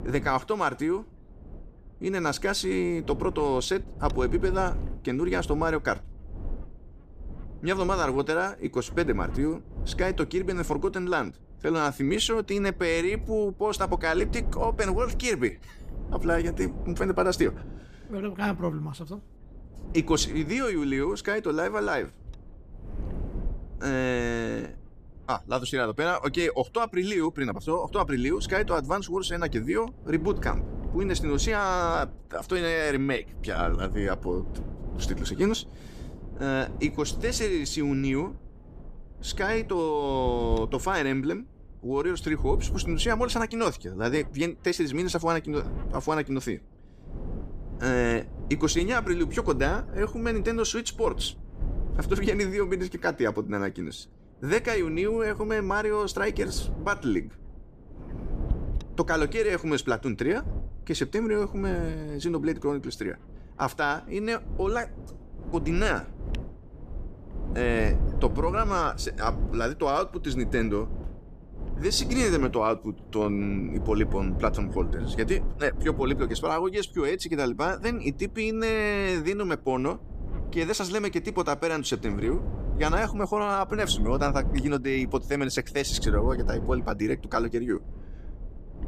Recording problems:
wind noise on the microphone; occasional gusts; 20 dB below the speech

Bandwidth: 14.5 kHz